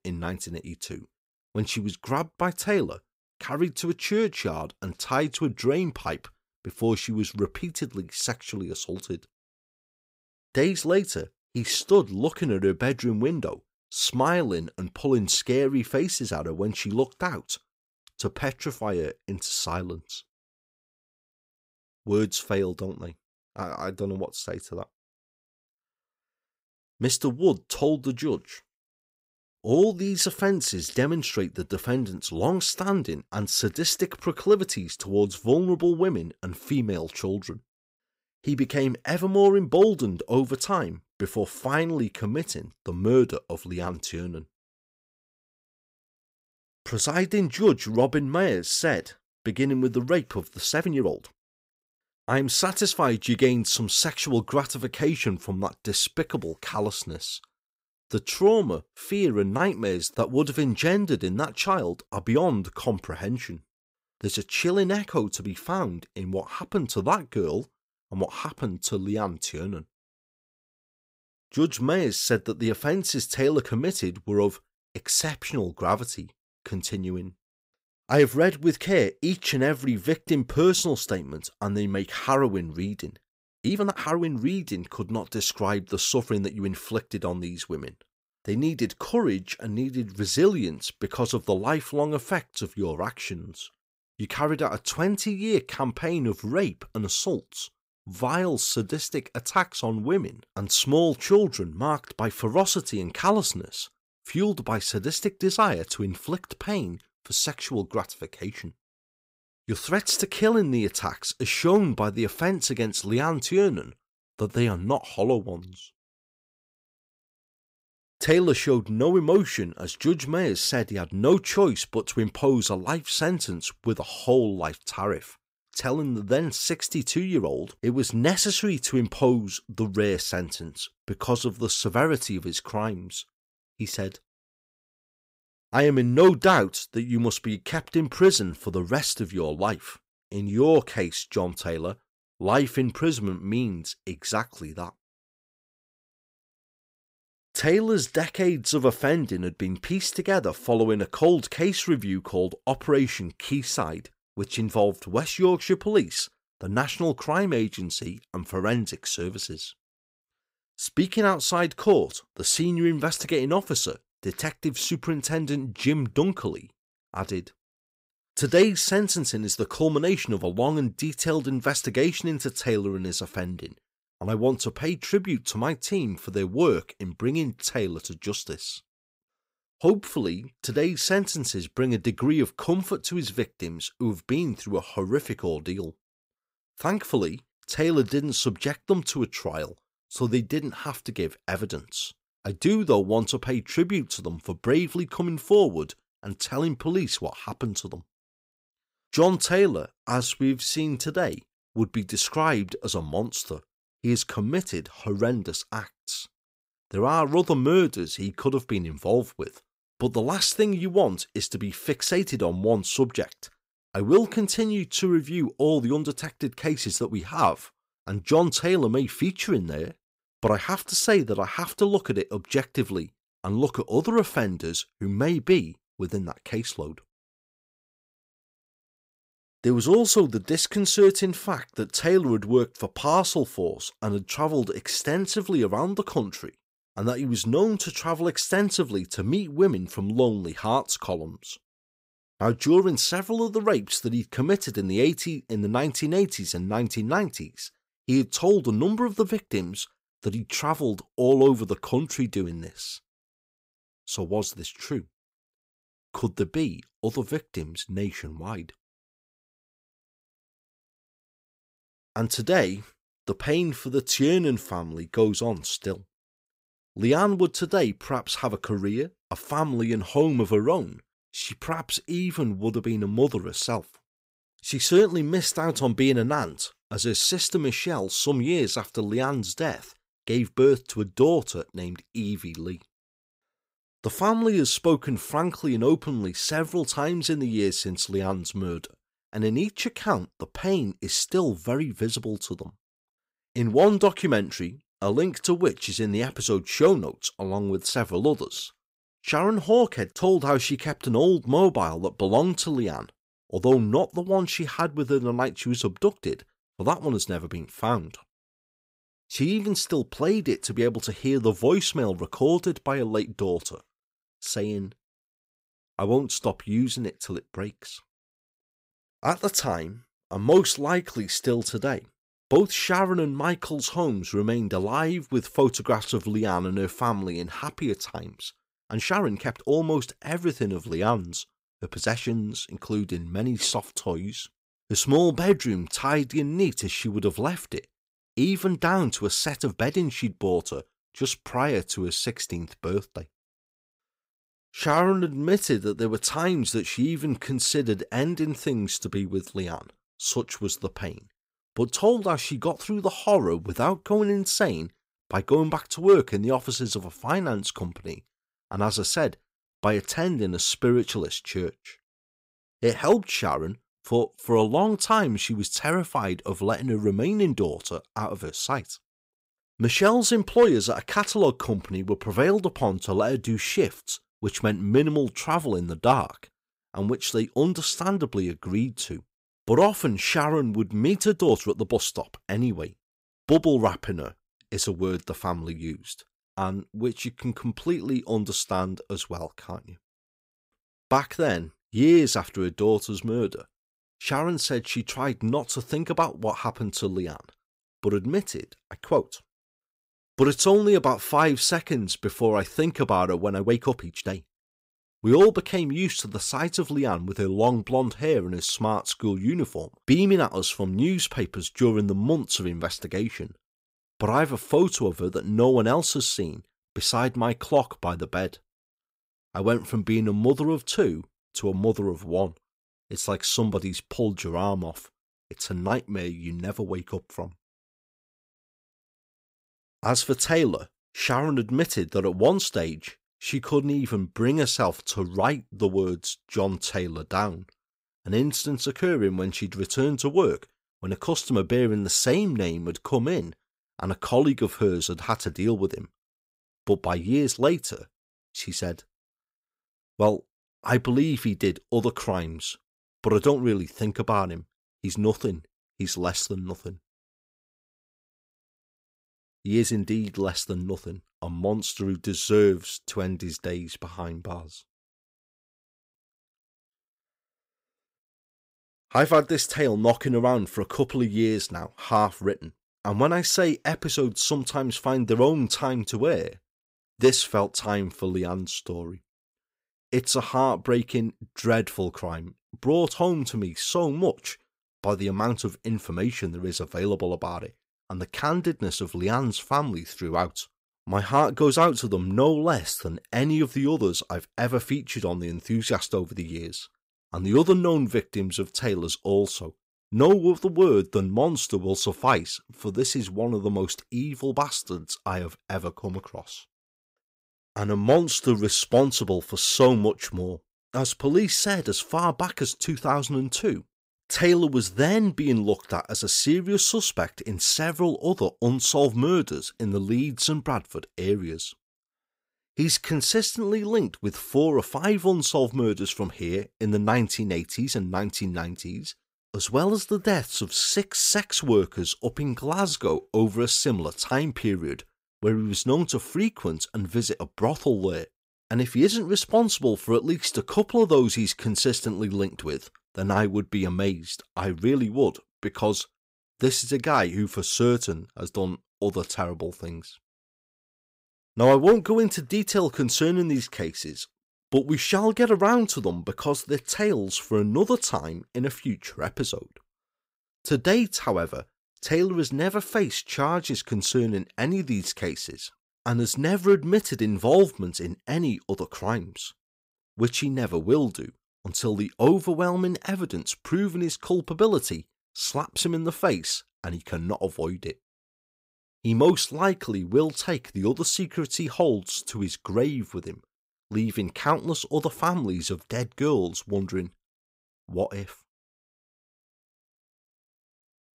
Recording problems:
uneven, jittery; strongly; from 51 s to 8:53

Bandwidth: 15.5 kHz